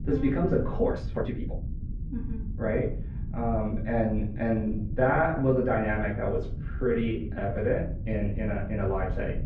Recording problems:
off-mic speech; far
muffled; very; fading above 1.5 kHz
room echo; slight; dies away in 0.4 s
low rumble; noticeable; throughout; 20 dB below the speech
uneven, jittery; strongly; from 1 to 7.5 s

